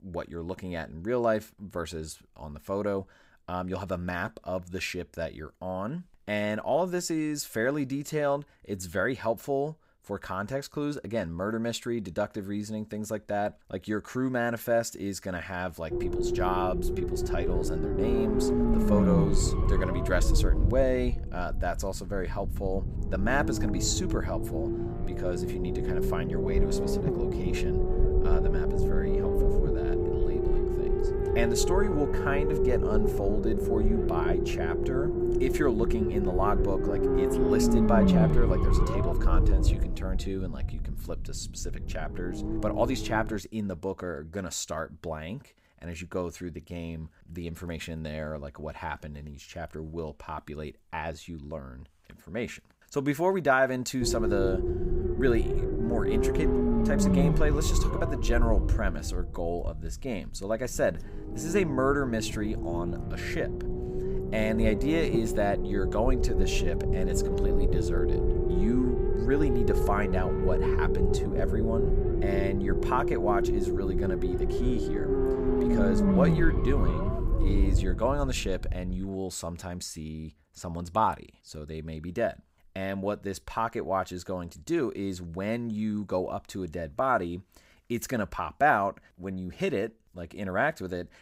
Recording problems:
low rumble; loud; from 16 to 43 s and from 54 s to 1:19; 1 dB below the speech

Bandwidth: 15.5 kHz